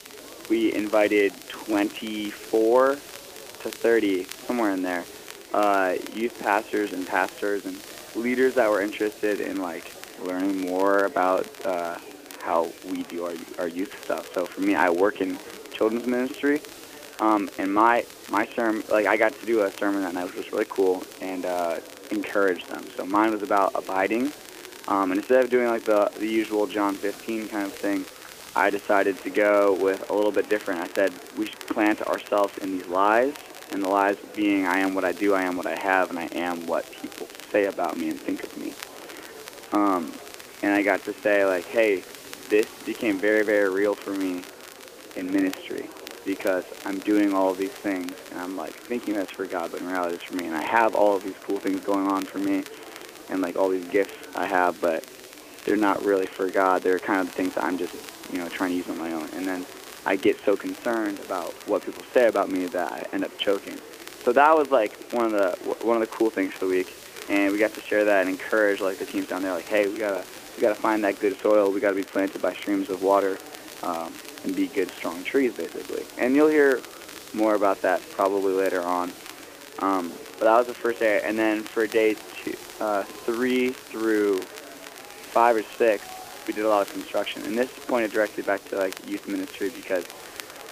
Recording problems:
phone-call audio
murmuring crowd; noticeable; throughout; 20 dB below the speech
crackle, like an old record; noticeable; 20 dB below the speech
hiss; faint; throughout; 20 dB below the speech

